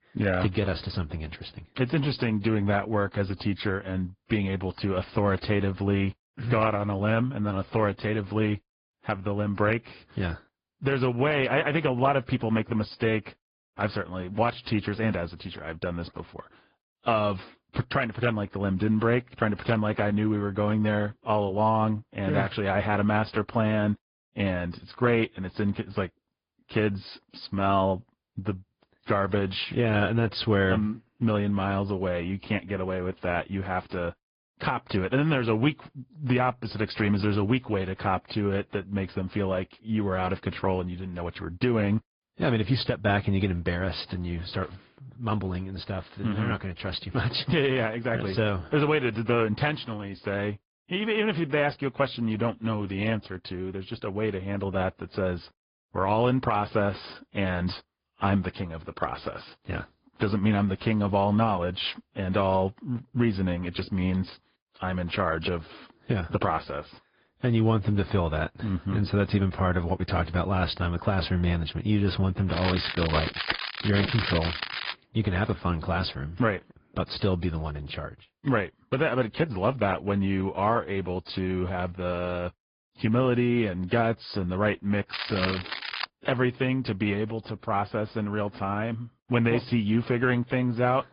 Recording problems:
high frequencies cut off; noticeable; nothing above 5 kHz
garbled, watery; slightly
crackling; loud; from 1:13 to 1:15 and at 1:25; 5 dB below the speech

